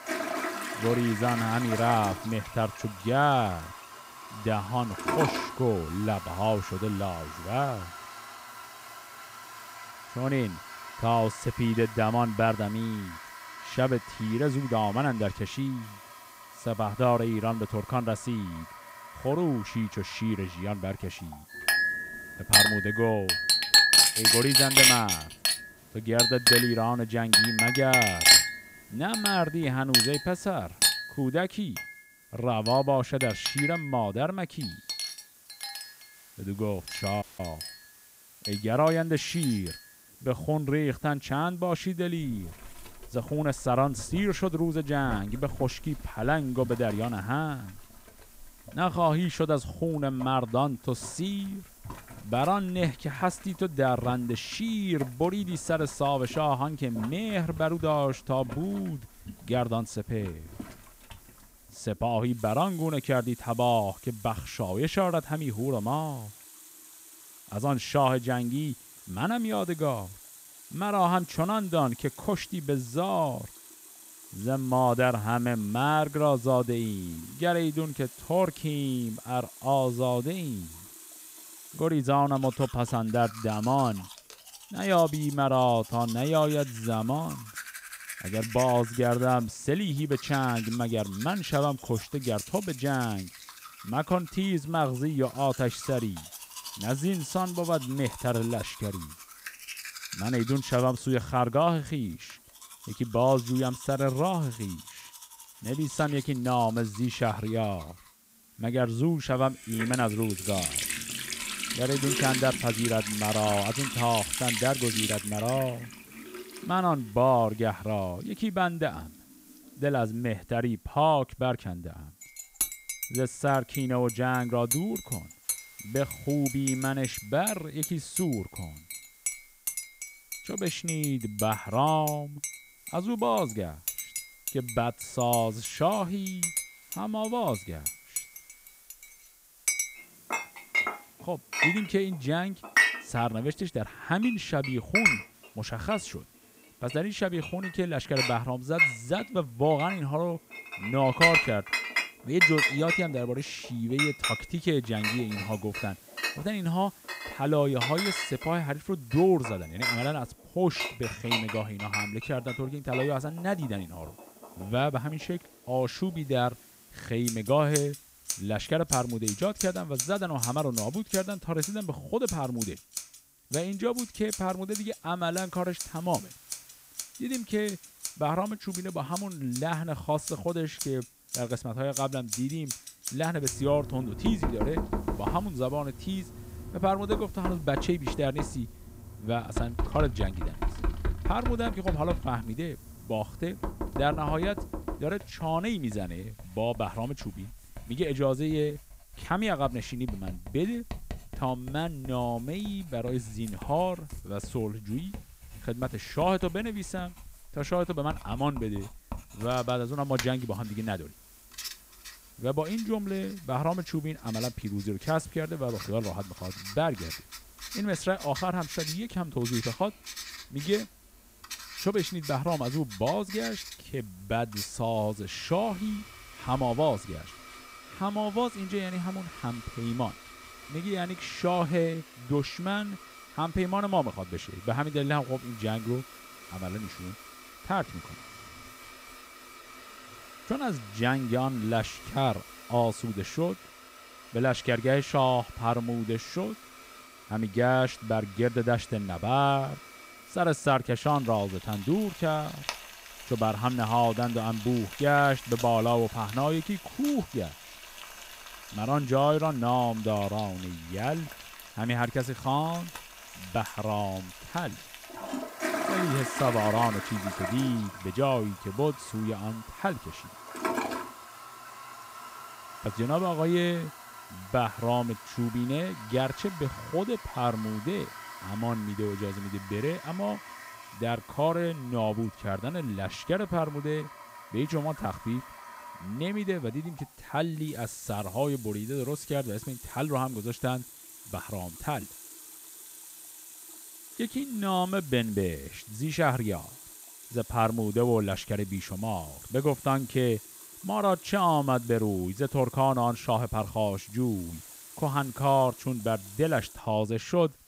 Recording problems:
household noises; loud; throughout; 1 dB below the speech
hiss; faint; throughout; 25 dB below the speech
audio cutting out; at 37 s

